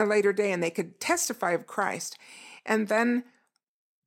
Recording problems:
abrupt cut into speech; at the start

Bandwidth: 16.5 kHz